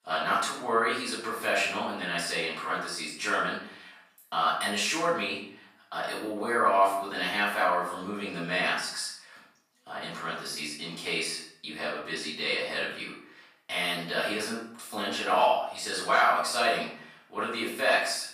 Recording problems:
off-mic speech; far
room echo; noticeable; dies away in 0.5 s
thin; somewhat; fading below 500 Hz

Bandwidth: 15 kHz